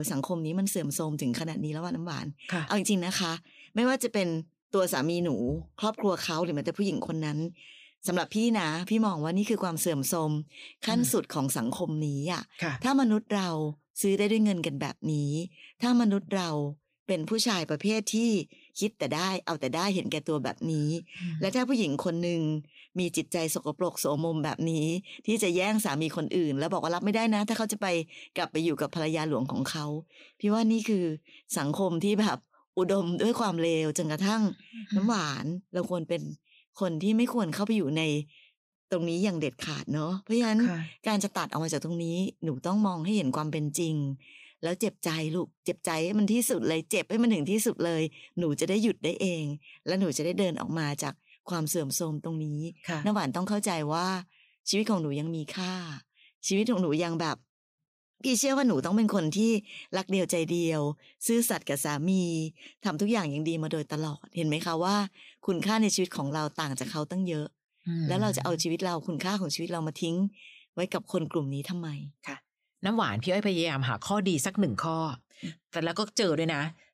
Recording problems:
abrupt cut into speech; at the start

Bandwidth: 15 kHz